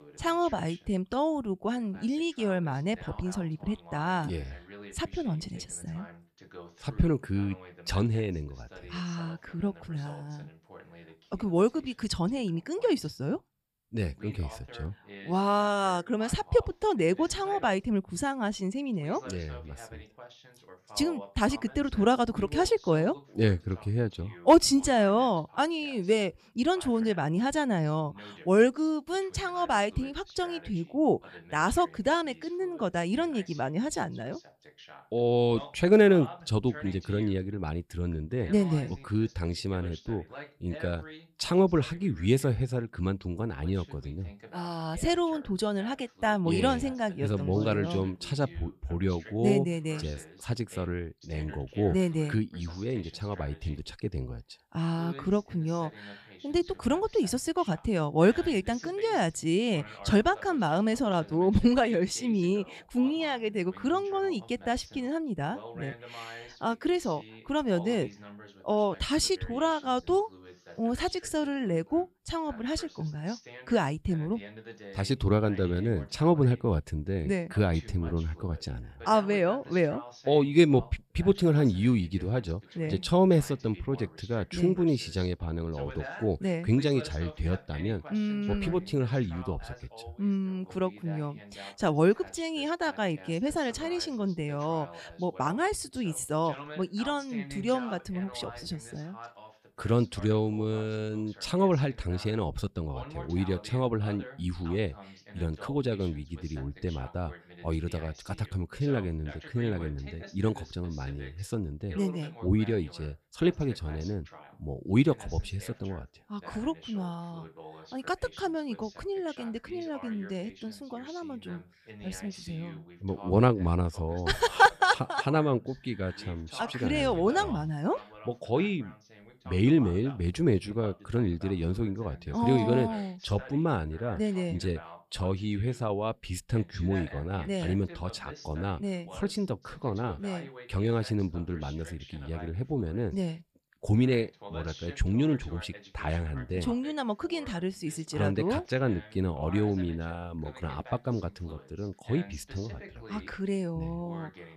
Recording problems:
voice in the background; noticeable; throughout; 20 dB below the speech

